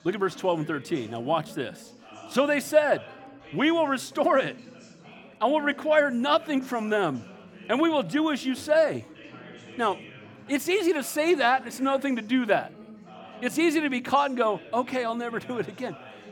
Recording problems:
background chatter; faint; throughout; 4 voices, 20 dB below the speech

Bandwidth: 17.5 kHz